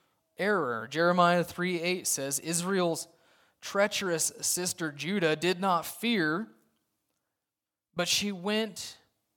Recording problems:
none

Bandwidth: 17 kHz